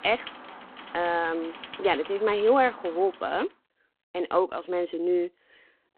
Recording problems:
phone-call audio; poor line
traffic noise; noticeable; until 3.5 s; 15 dB below the speech

